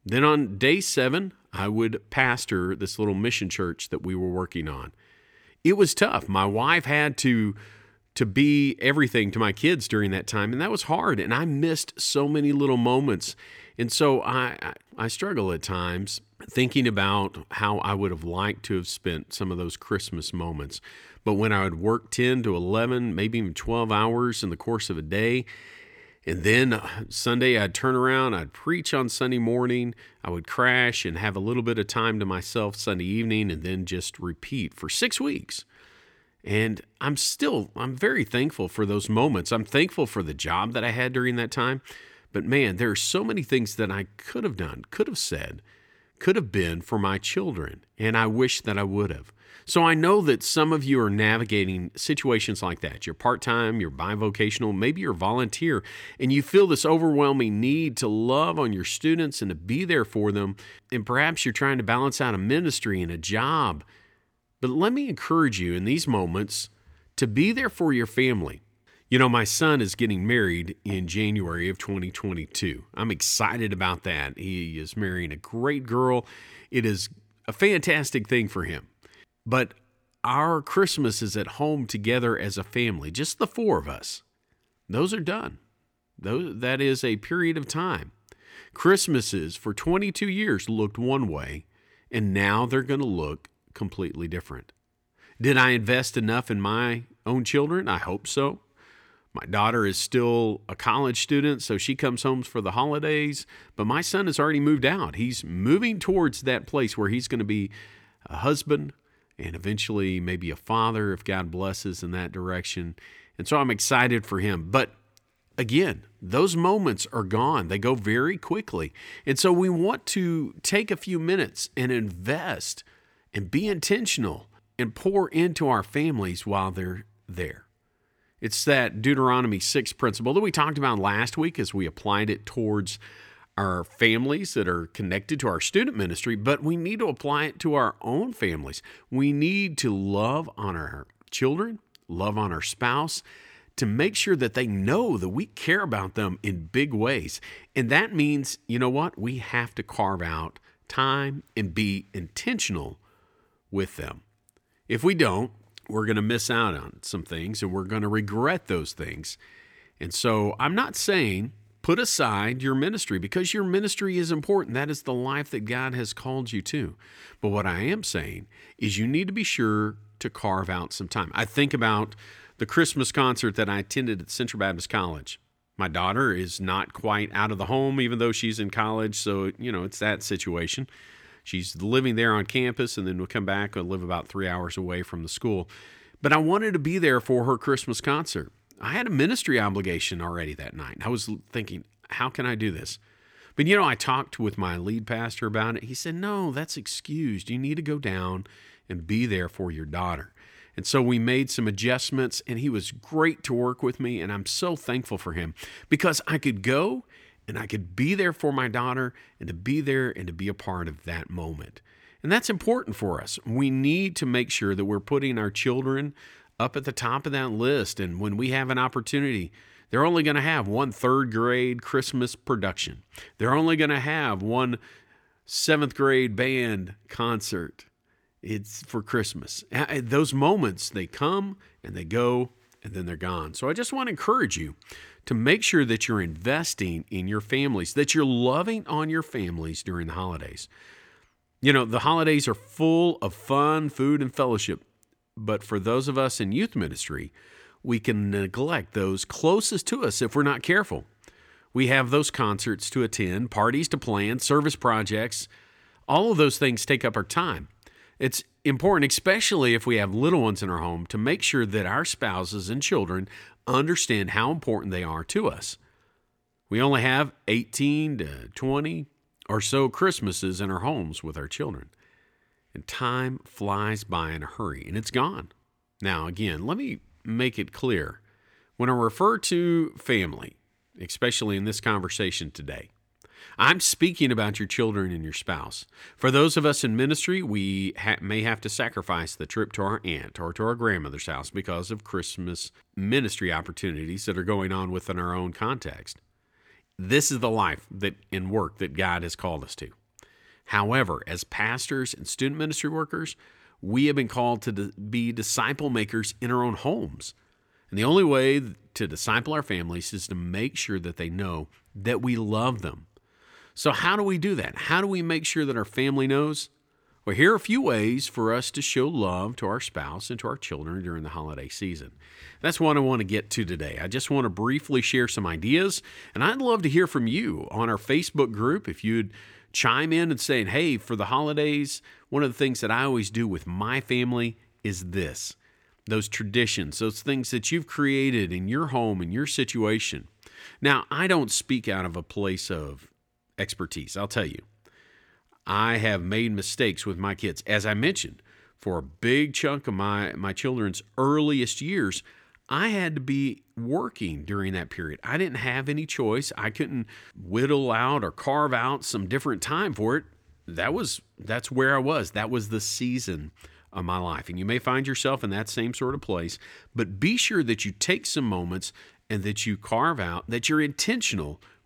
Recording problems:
none

